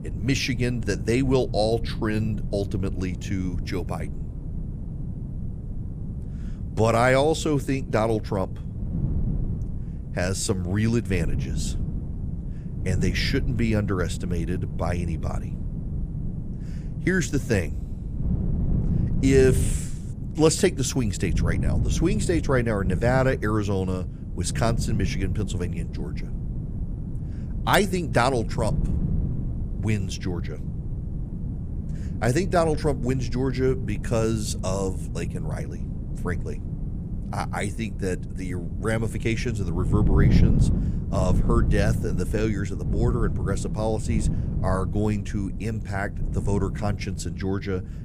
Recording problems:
wind noise on the microphone; occasional gusts; 15 dB below the speech

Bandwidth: 15 kHz